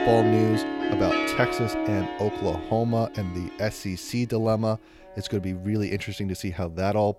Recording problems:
background music; very loud; throughout; as loud as the speech

